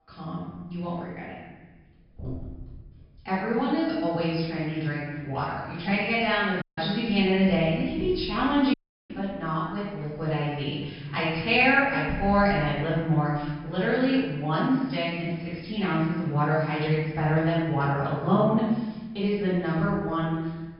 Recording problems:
room echo; strong; dies away in 1.4 s
off-mic speech; far
high frequencies cut off; noticeable; nothing above 5.5 kHz
audio cutting out; at 6.5 s and at 8.5 s

